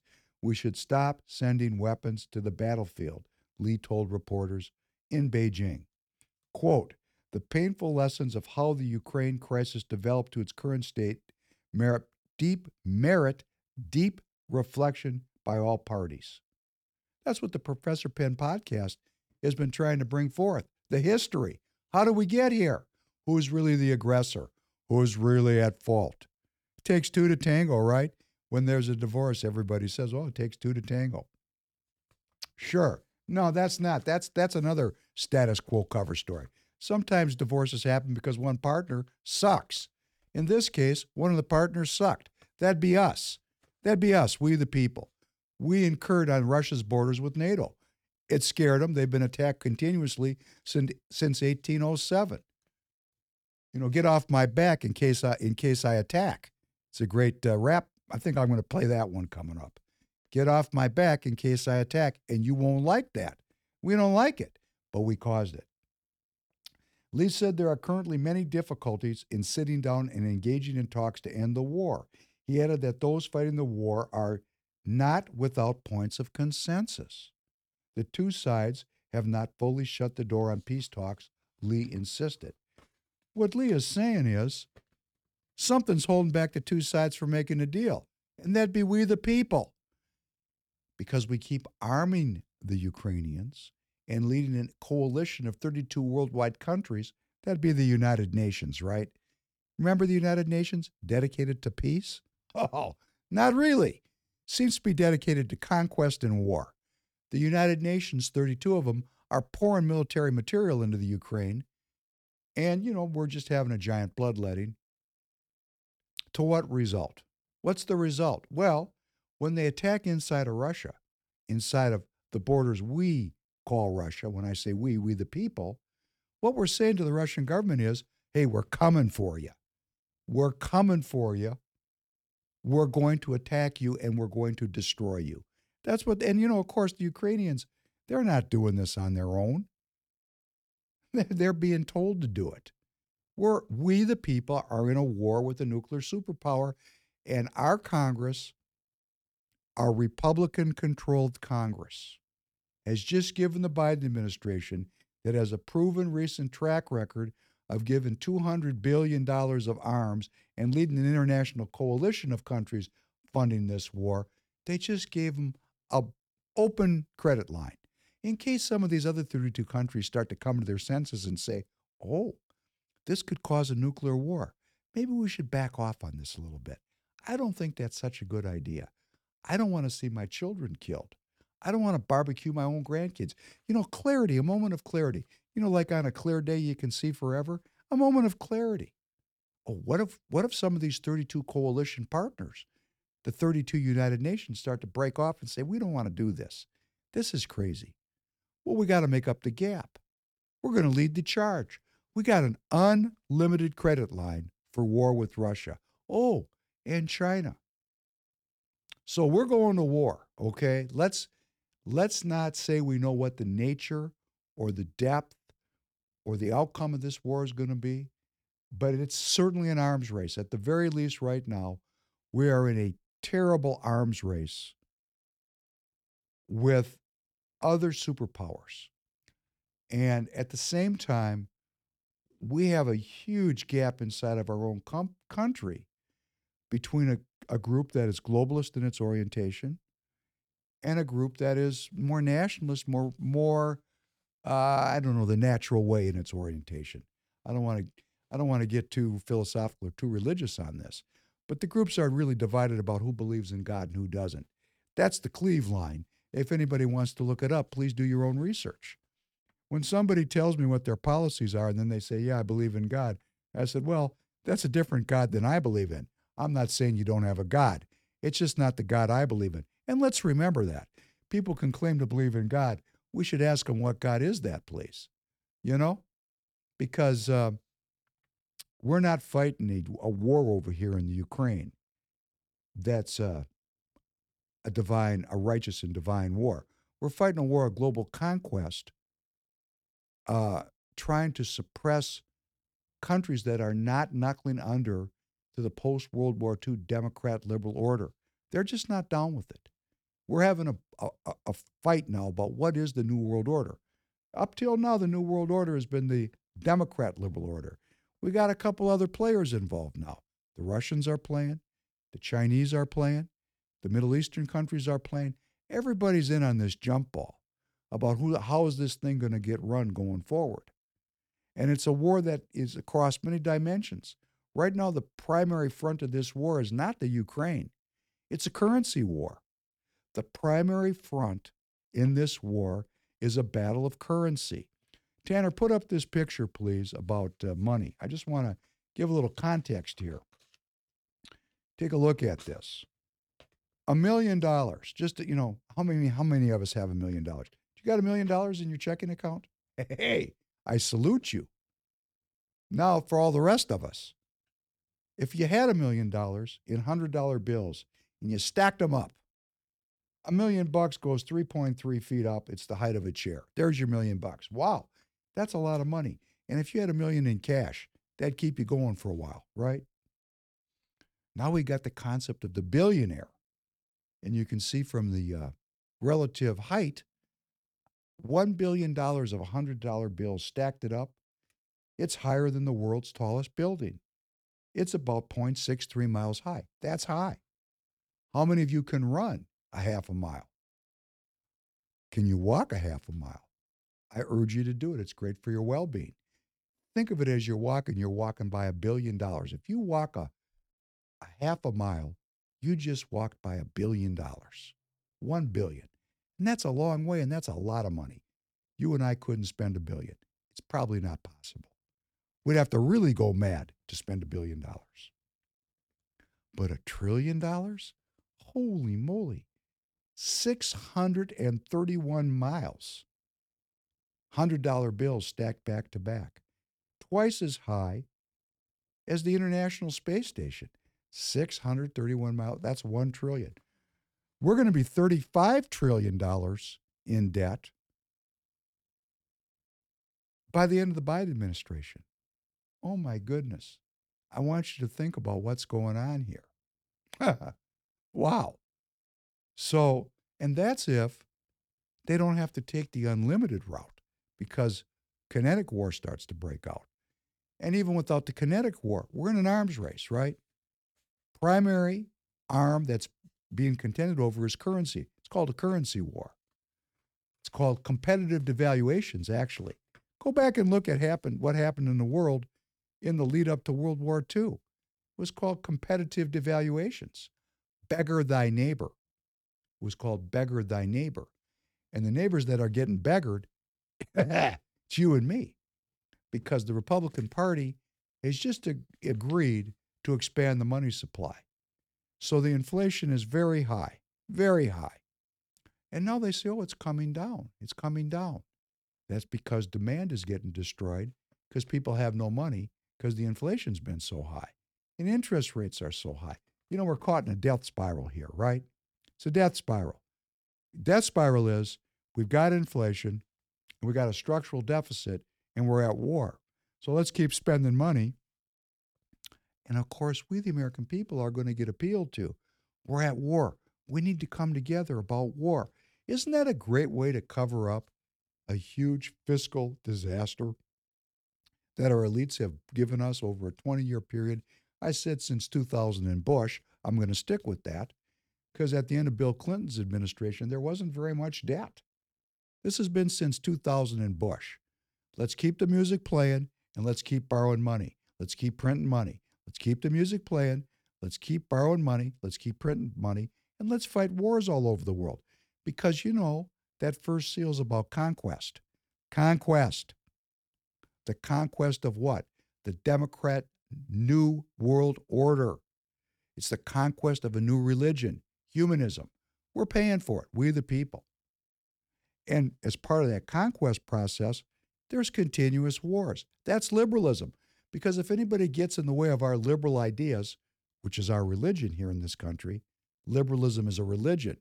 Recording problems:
none

